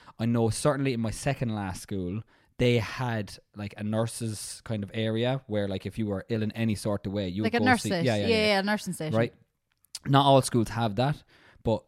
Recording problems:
none

